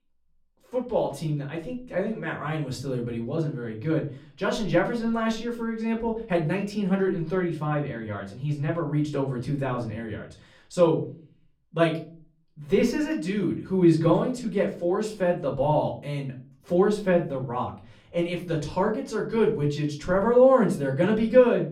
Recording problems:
off-mic speech; far
room echo; very slight; dies away in 0.4 s

